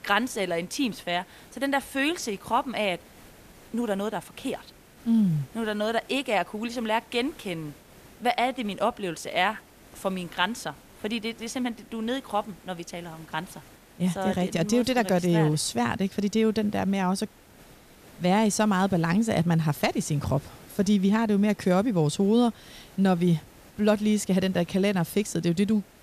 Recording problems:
hiss; faint; throughout; 25 dB below the speech

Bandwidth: 14.5 kHz